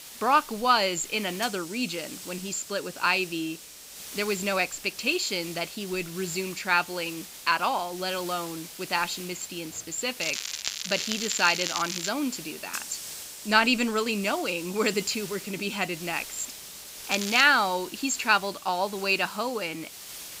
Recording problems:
high frequencies cut off; noticeable; nothing above 8 kHz
crackling; loud; from 10 to 12 s and at 17 s; 4 dB below the speech
hiss; noticeable; throughout; 10 dB below the speech

